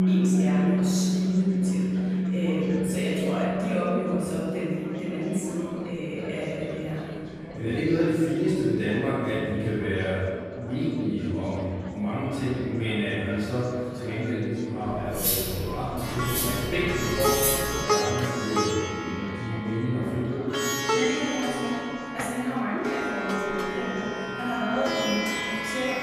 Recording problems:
room echo; strong; dies away in 1.9 s
off-mic speech; far
background music; very loud; throughout; 1 dB above the speech
chatter from many people; noticeable; throughout; 10 dB below the speech
clattering dishes; loud; from 15 to 18 s; peak 5 dB above the speech

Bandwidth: 14.5 kHz